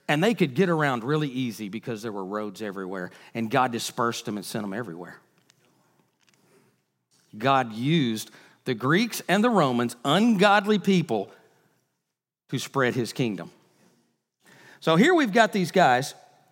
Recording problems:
none

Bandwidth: 16 kHz